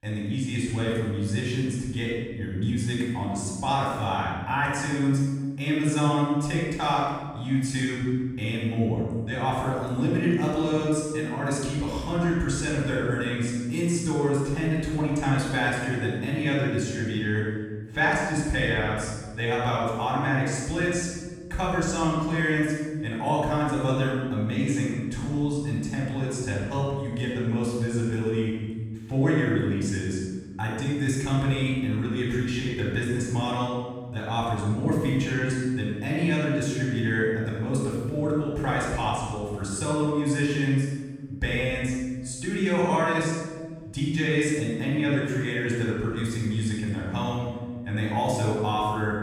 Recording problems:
room echo; strong; dies away in 1.5 s
off-mic speech; far

